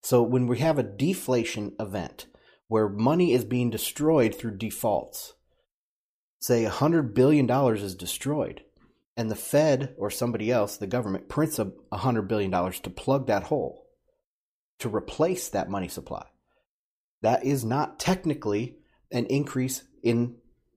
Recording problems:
none

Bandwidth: 15 kHz